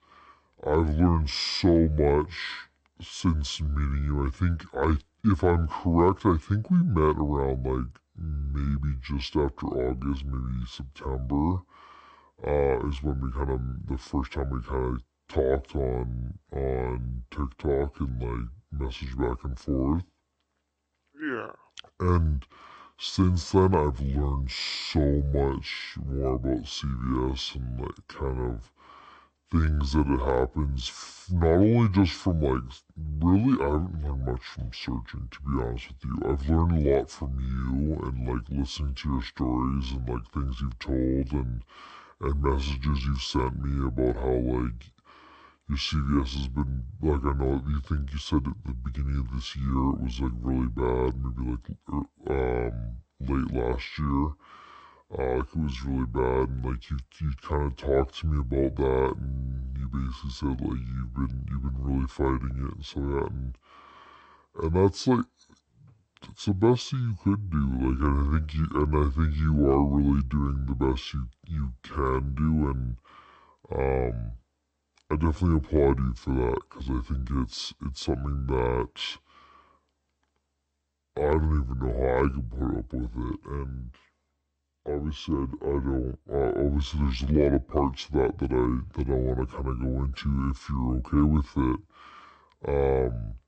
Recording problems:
wrong speed and pitch; too slow and too low; 0.6 times normal speed

